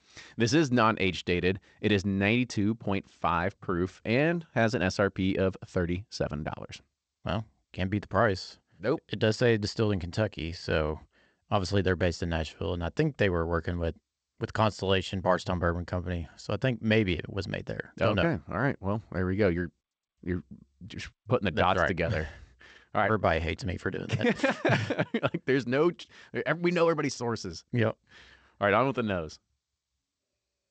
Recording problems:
garbled, watery; slightly; nothing above 8 kHz

